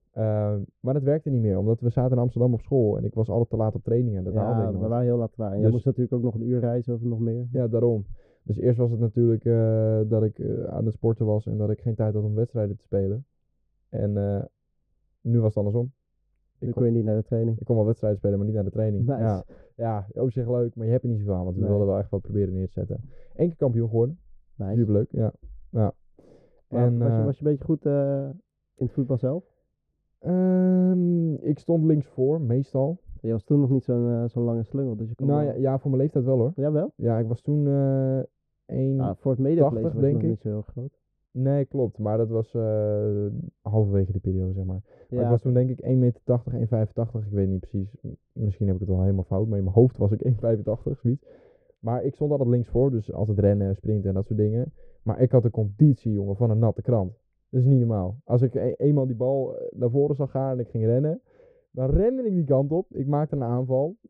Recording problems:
muffled; very; fading above 1 kHz

